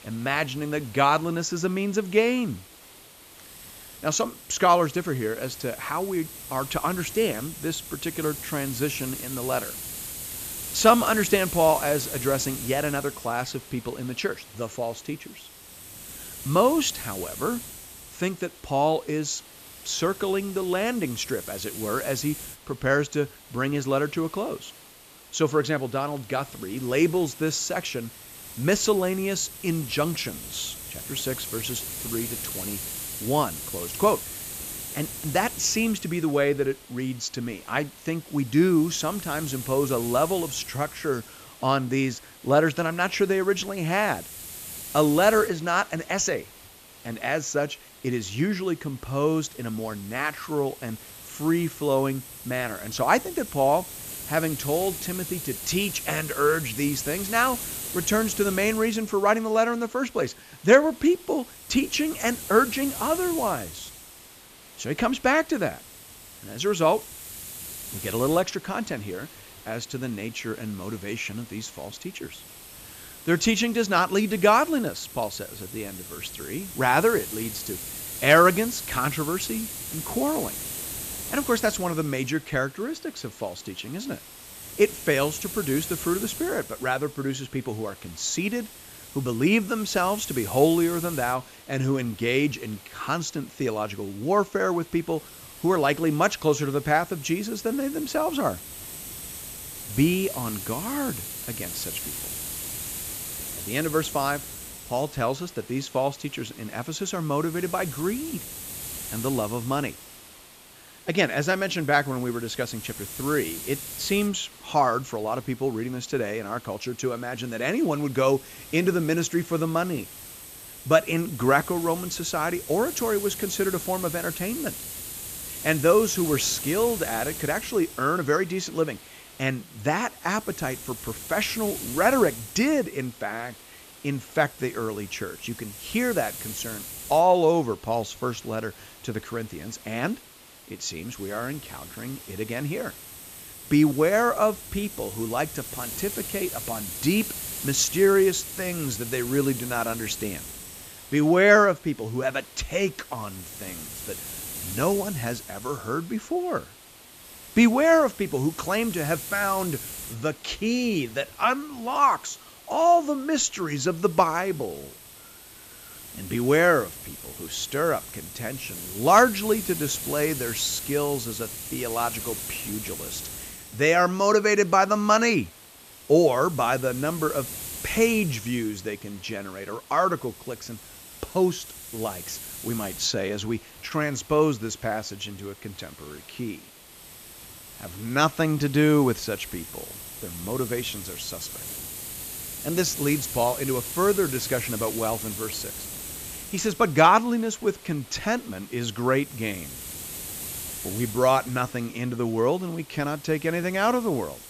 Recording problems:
high frequencies cut off; noticeable; nothing above 8 kHz
hiss; noticeable; throughout; 10 dB below the speech

